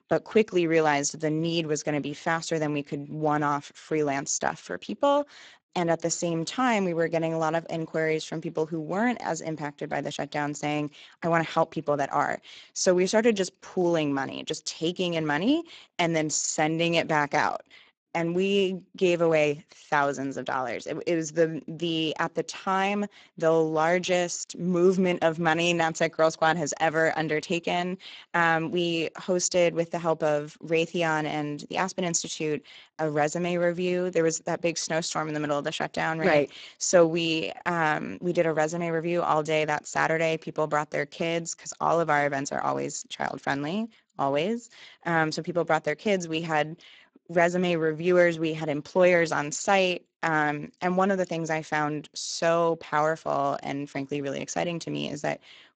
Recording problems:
garbled, watery; badly; nothing above 7.5 kHz

